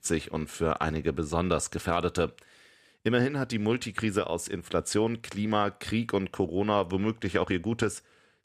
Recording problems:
none

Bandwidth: 14.5 kHz